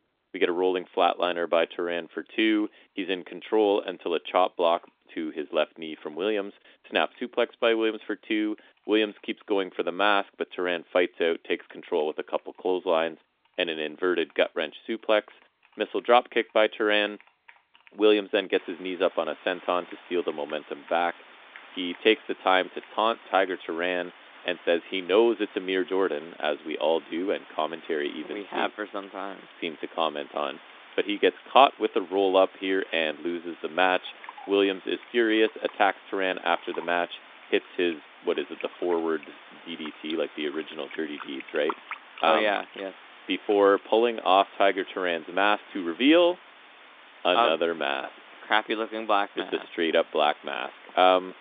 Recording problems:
phone-call audio; nothing above 3.5 kHz
household noises; faint; throughout; 25 dB below the speech
hiss; faint; from 19 s on; 20 dB below the speech

